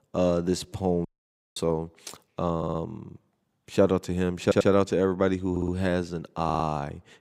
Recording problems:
audio cutting out; at 1 s for 0.5 s
audio stuttering; 4 times, first at 2.5 s

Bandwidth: 15.5 kHz